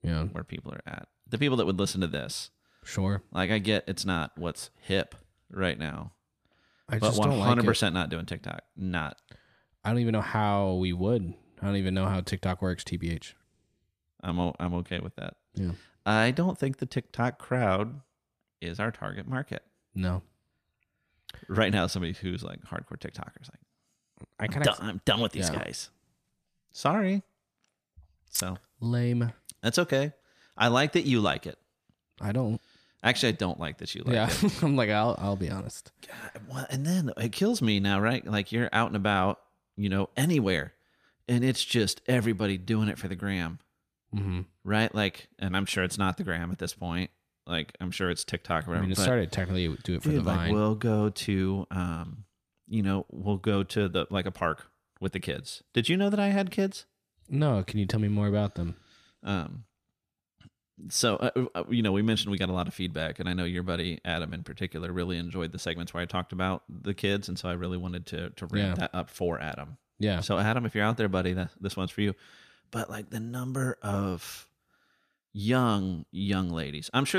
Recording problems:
abrupt cut into speech; at the end

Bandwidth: 14.5 kHz